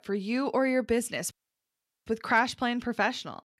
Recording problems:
audio cutting out; at 1.5 s for 1 s

